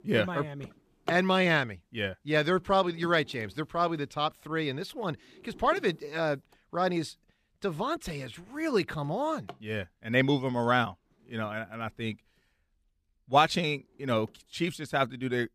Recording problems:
household noises; noticeable; throughout; 20 dB below the speech

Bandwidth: 14.5 kHz